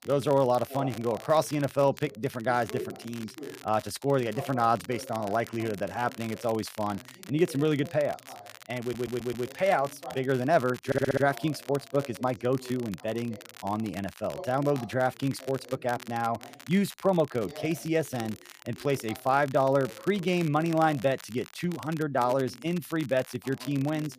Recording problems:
voice in the background; noticeable; throughout; 20 dB below the speech
crackle, like an old record; noticeable; 20 dB below the speech
audio stuttering; at 9 s and at 11 s

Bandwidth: 15 kHz